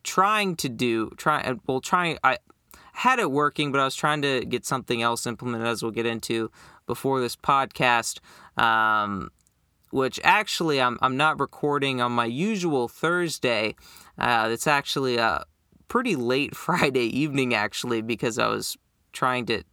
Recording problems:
none

